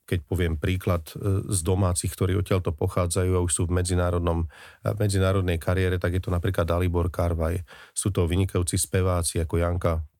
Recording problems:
none

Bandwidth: 18.5 kHz